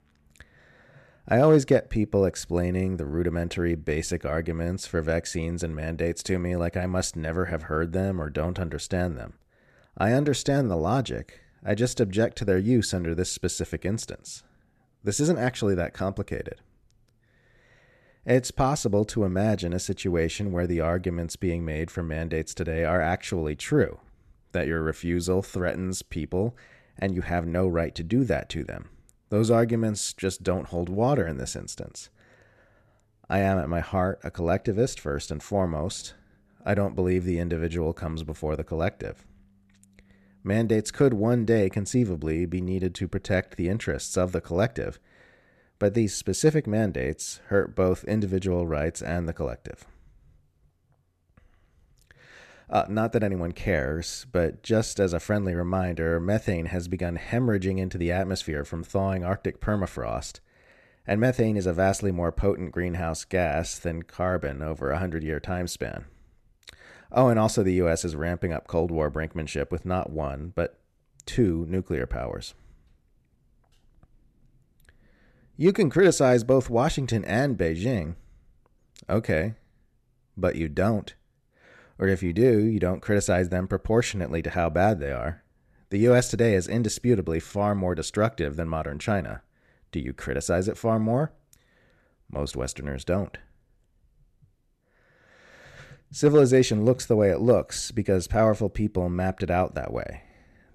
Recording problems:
none

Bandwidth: 13.5 kHz